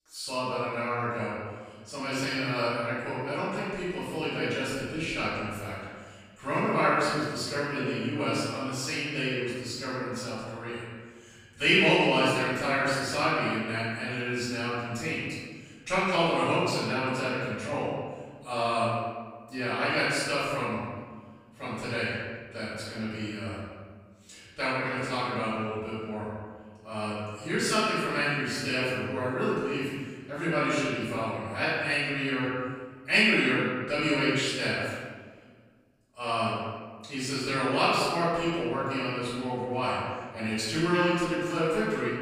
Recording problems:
room echo; strong; dies away in 1.5 s
off-mic speech; far

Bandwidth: 15.5 kHz